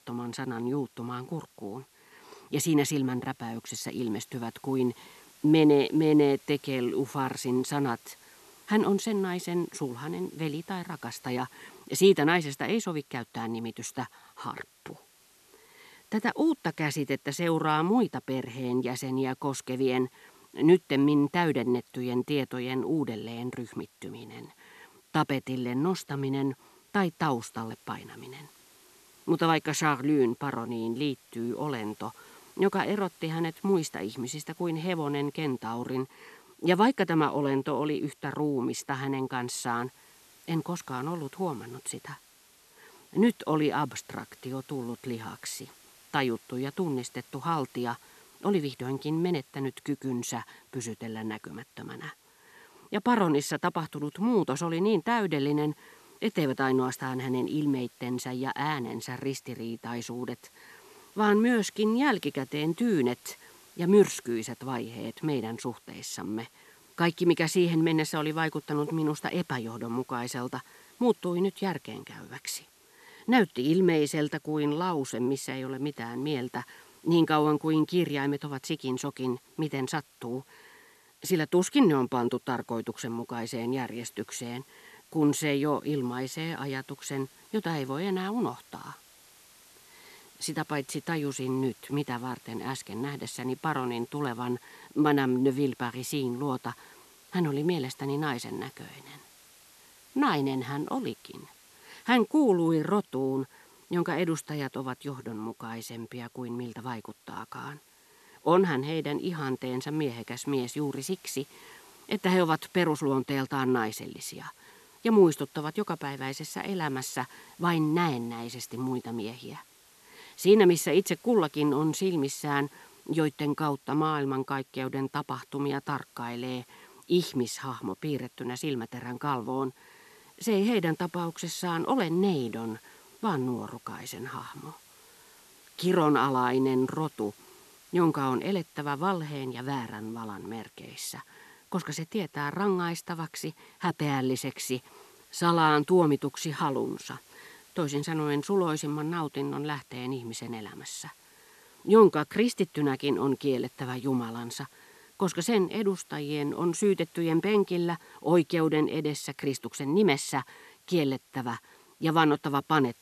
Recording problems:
hiss; faint; throughout; 25 dB below the speech

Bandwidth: 13.5 kHz